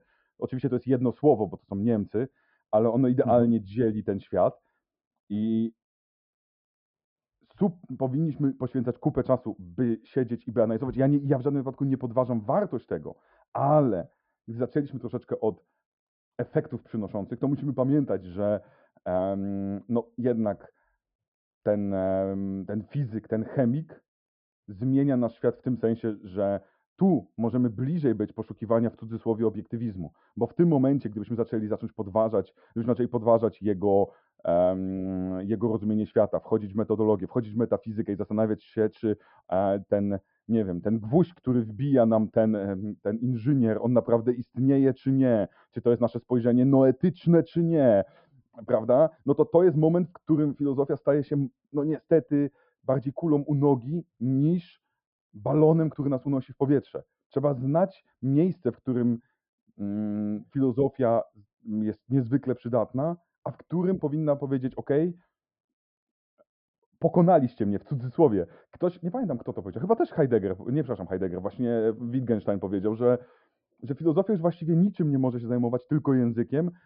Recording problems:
high frequencies cut off; noticeable; nothing above 5.5 kHz
muffled; very slightly; fading above 1.5 kHz

